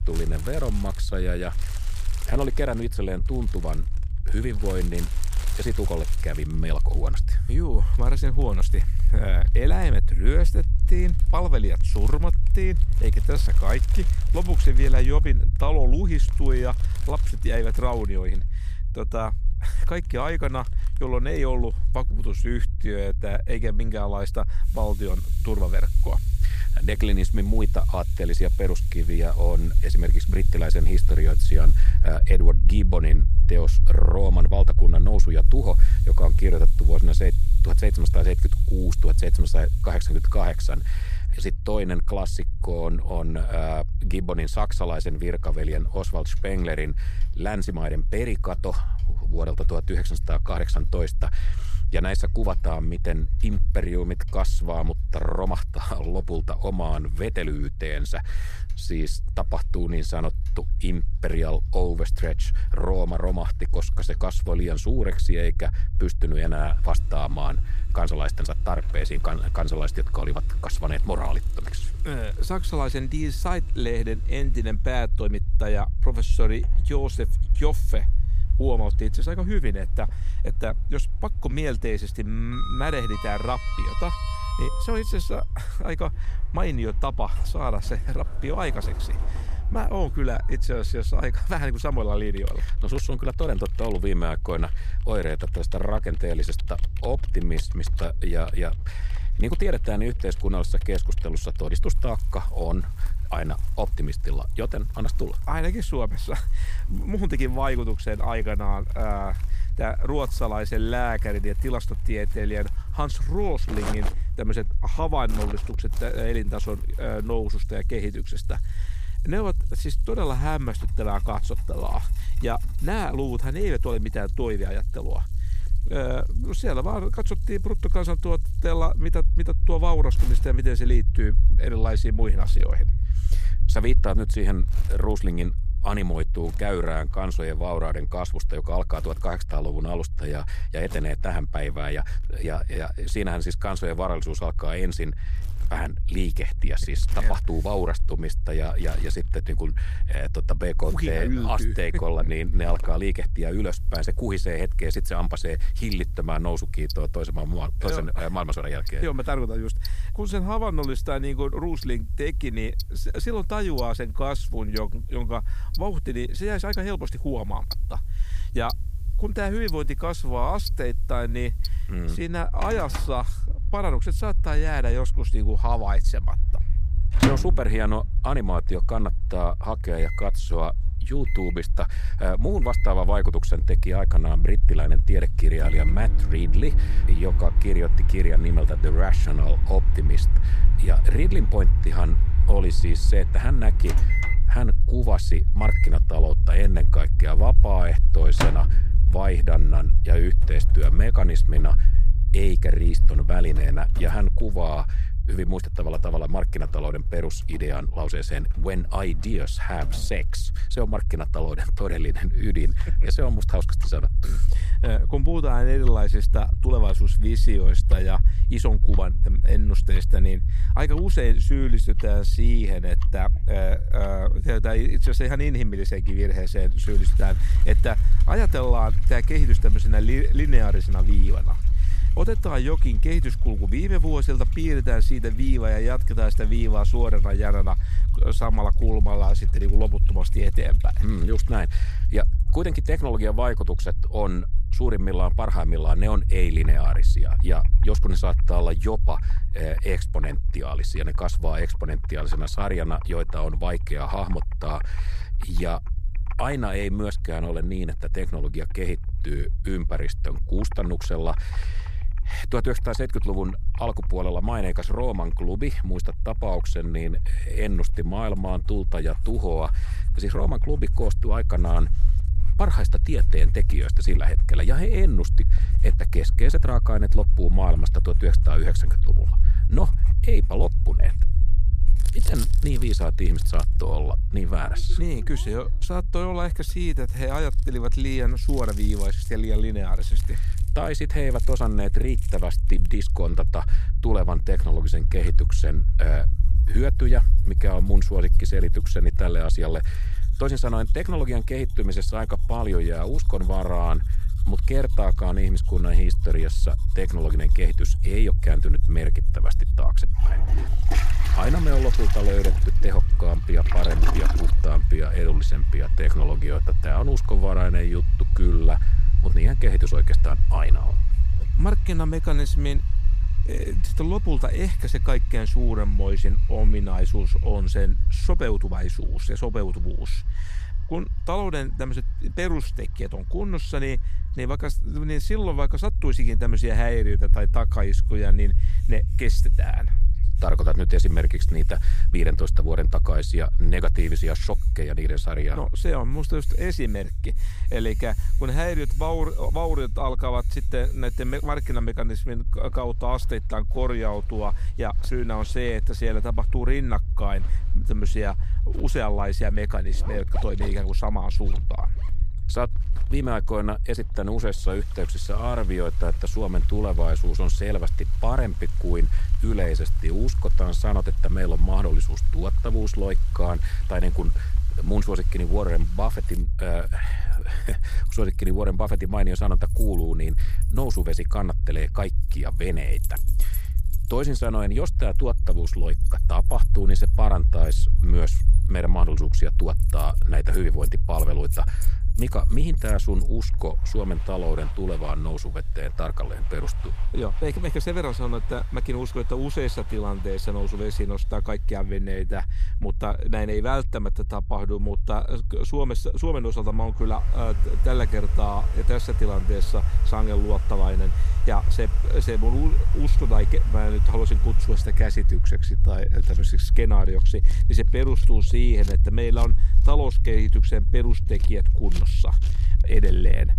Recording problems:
household noises; noticeable; throughout; 10 dB below the speech
low rumble; noticeable; throughout; 15 dB below the speech

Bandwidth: 15 kHz